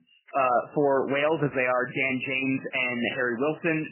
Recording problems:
garbled, watery; badly; nothing above 3 kHz

